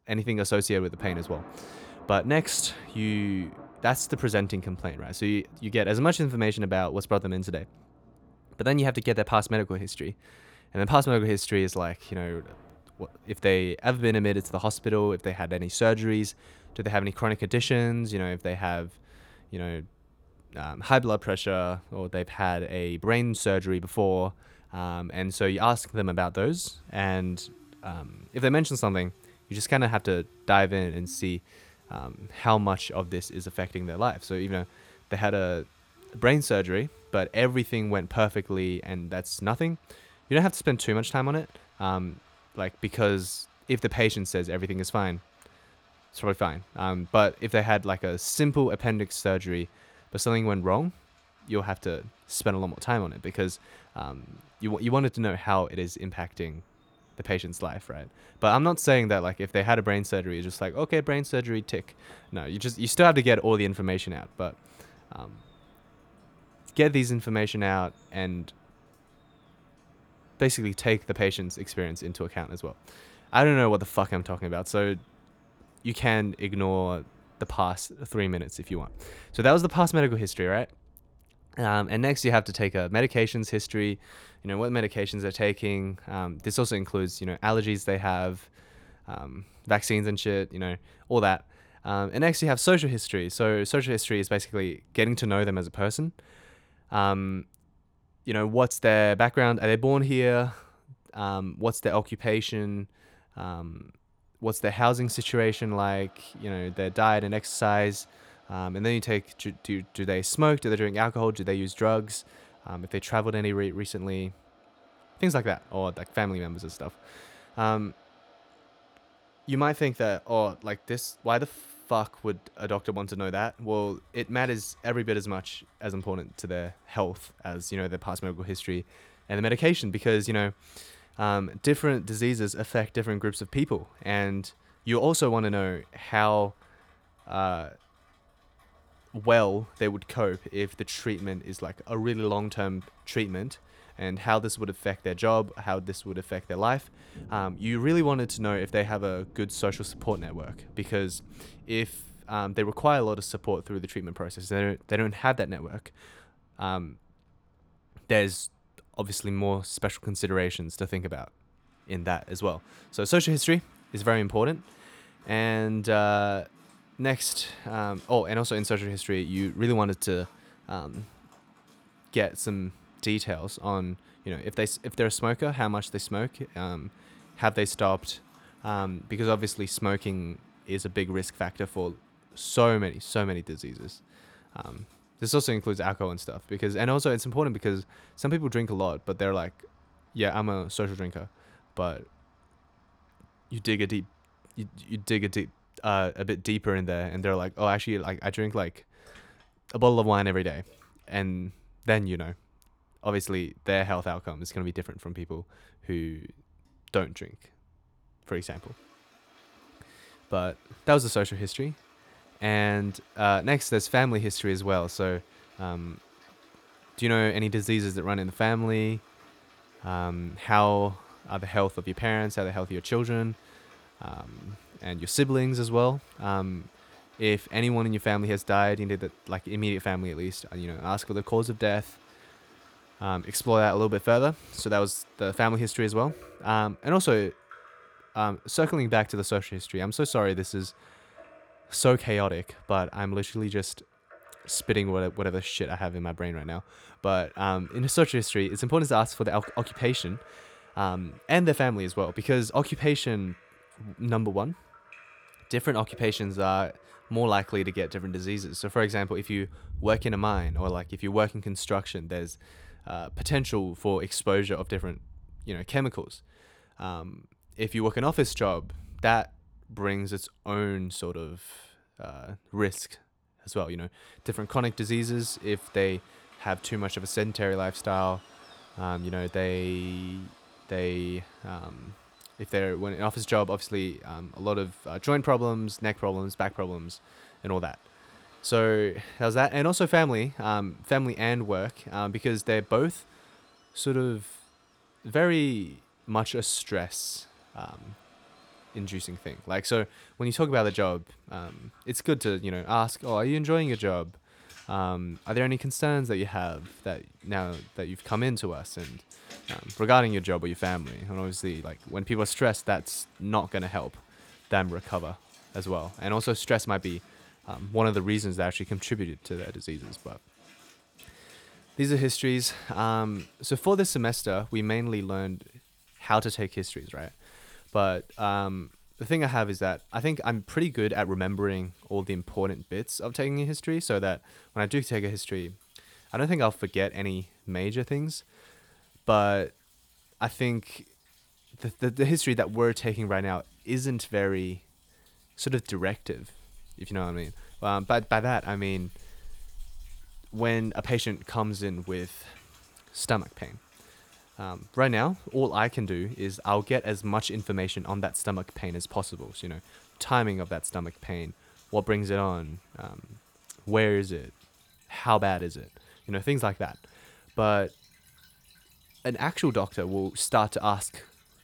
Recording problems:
rain or running water; faint; throughout; 25 dB below the speech

